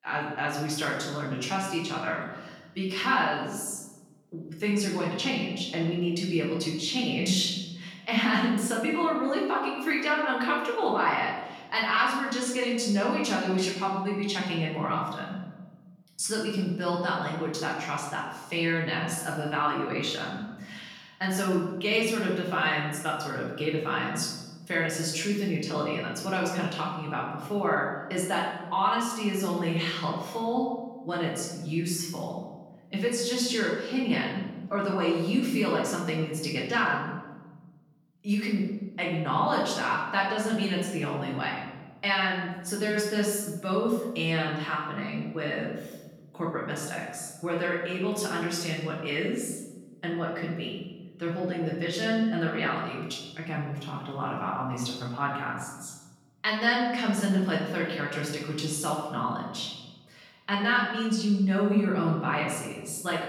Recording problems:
off-mic speech; far
room echo; noticeable; dies away in 1.1 s

